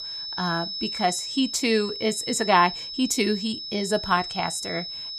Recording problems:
high-pitched whine; loud; throughout; 5 kHz, 6 dB below the speech

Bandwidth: 14.5 kHz